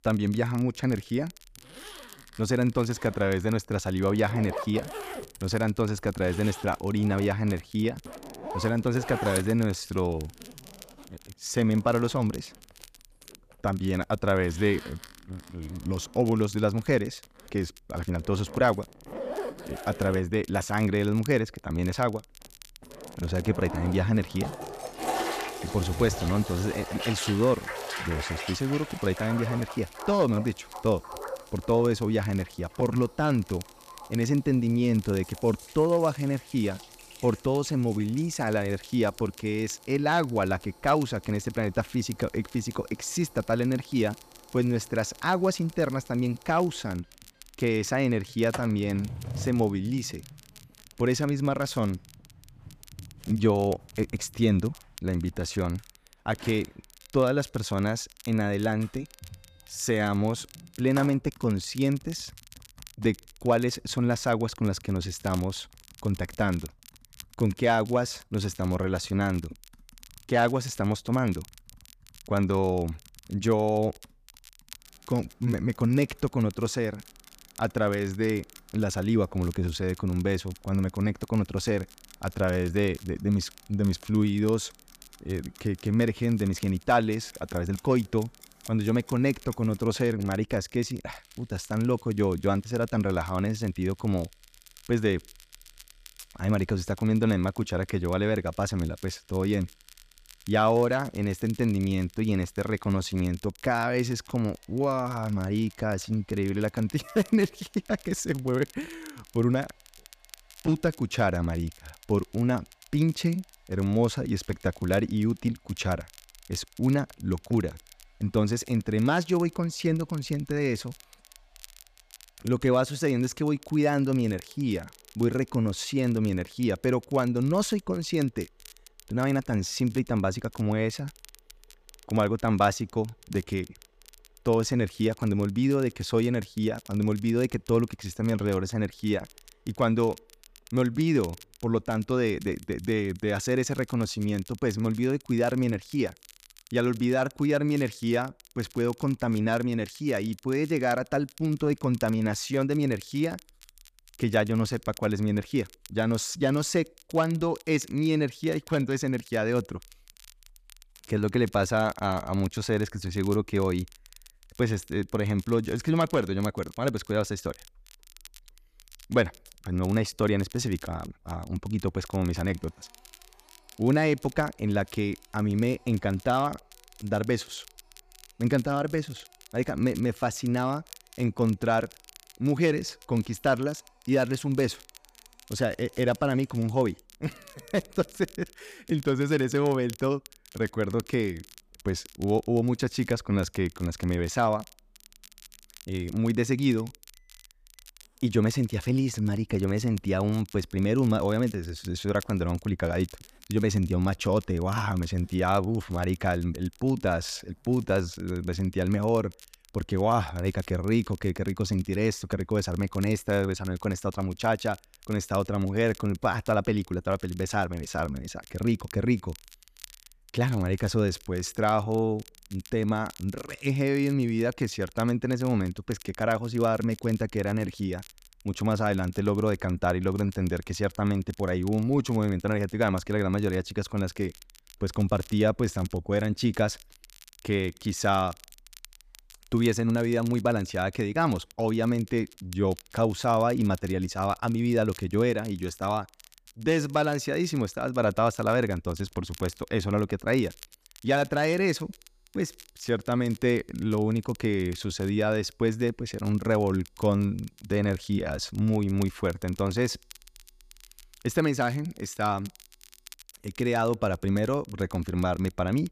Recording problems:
household noises; noticeable; throughout; 15 dB below the speech
crackle, like an old record; faint; 25 dB below the speech

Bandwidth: 14.5 kHz